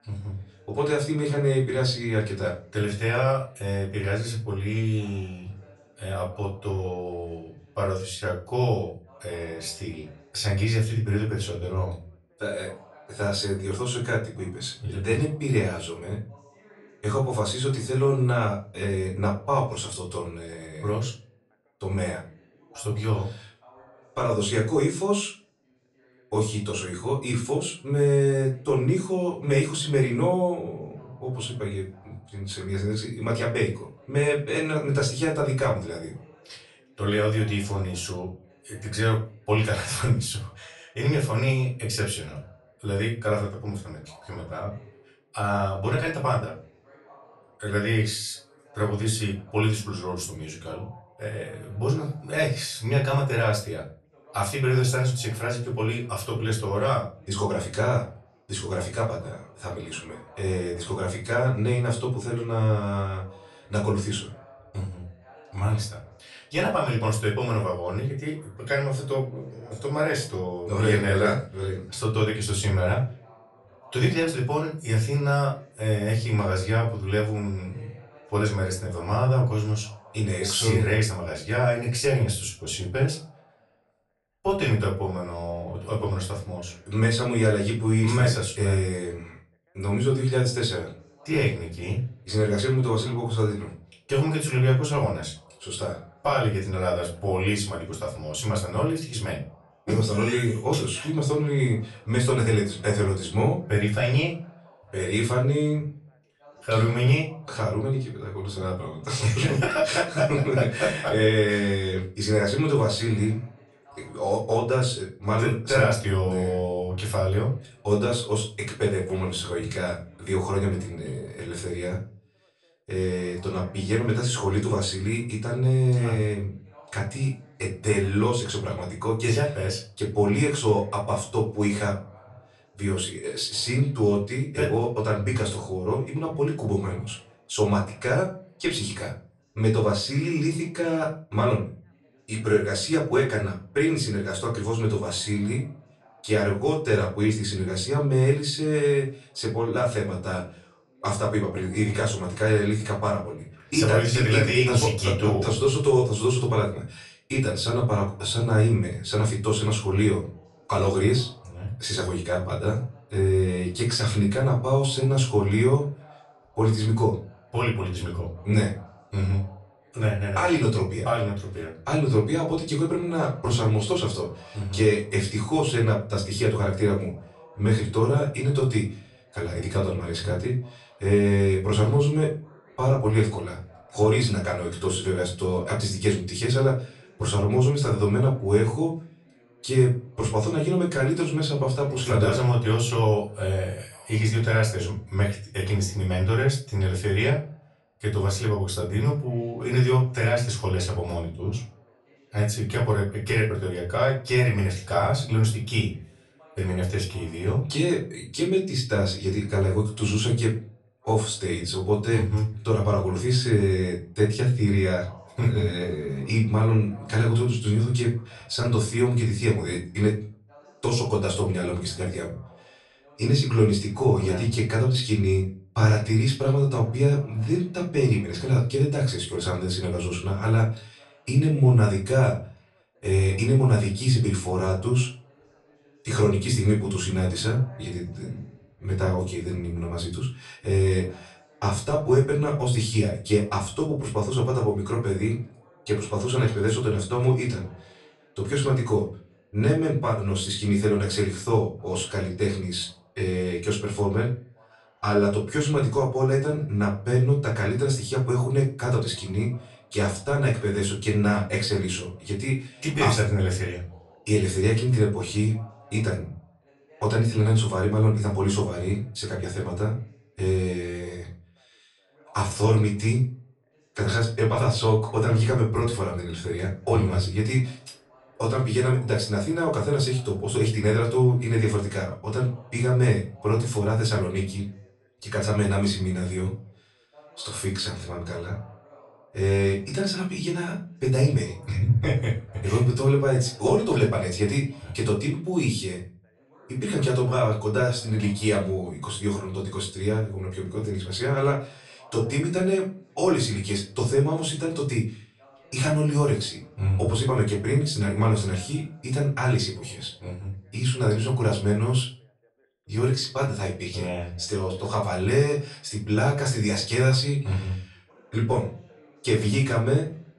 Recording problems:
off-mic speech; far
room echo; slight; dies away in 0.3 s
background chatter; faint; throughout; 2 voices, 30 dB below the speech

